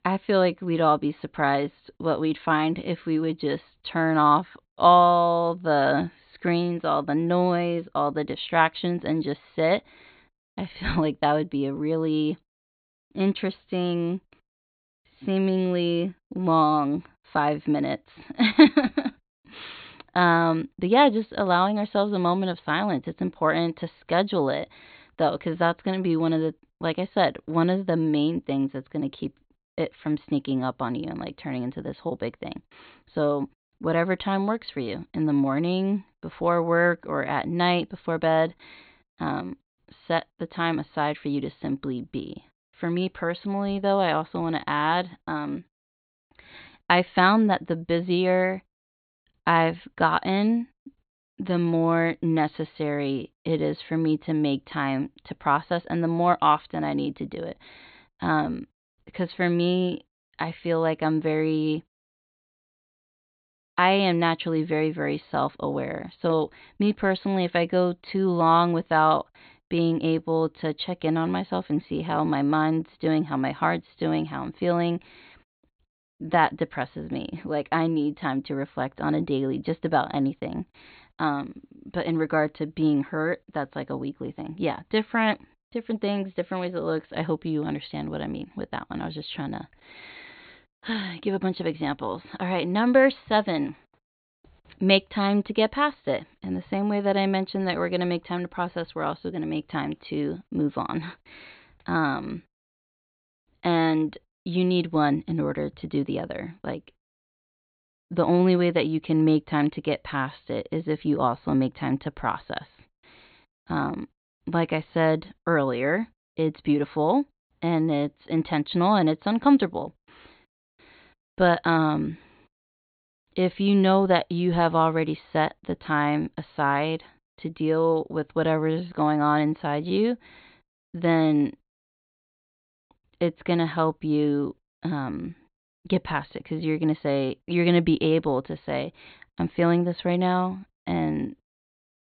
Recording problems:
high frequencies cut off; severe; nothing above 4.5 kHz

